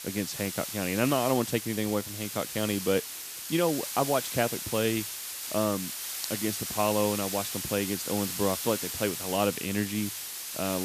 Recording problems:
hiss; loud; throughout; 4 dB below the speech
abrupt cut into speech; at the end

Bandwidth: 14.5 kHz